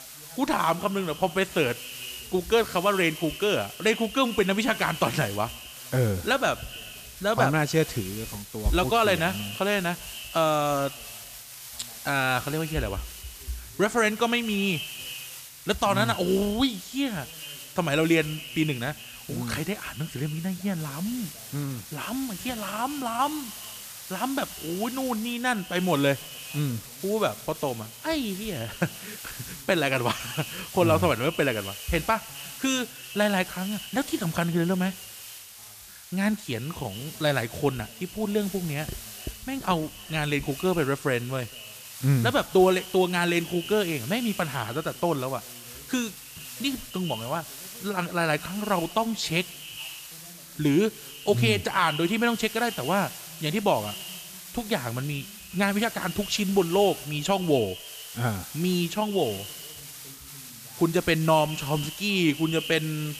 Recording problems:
echo of what is said; noticeable; throughout; 130 ms later, 15 dB below the speech
hiss; noticeable; throughout; 15 dB below the speech
voice in the background; faint; throughout; 30 dB below the speech

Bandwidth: 14.5 kHz